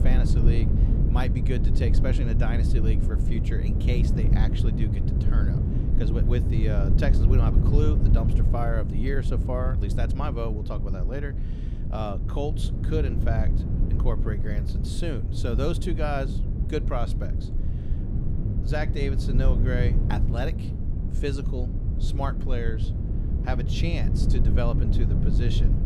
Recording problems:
low rumble; loud; throughout; 4 dB below the speech

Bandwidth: 15 kHz